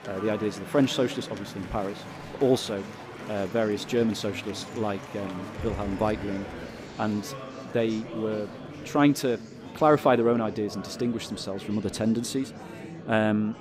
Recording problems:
murmuring crowd; noticeable; throughout; 10 dB below the speech

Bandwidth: 15.5 kHz